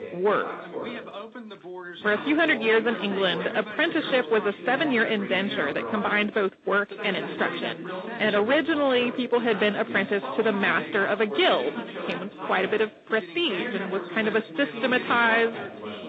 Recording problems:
phone-call audio; nothing above 8 kHz
distortion; slight; 7% of the sound clipped
garbled, watery; slightly
background chatter; noticeable; throughout; 2 voices, 10 dB below the speech

